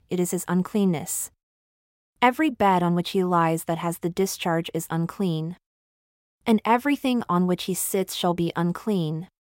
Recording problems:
none

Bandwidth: 16 kHz